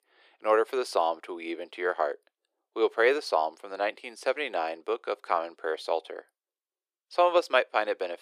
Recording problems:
thin; very; fading below 350 Hz

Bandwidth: 14.5 kHz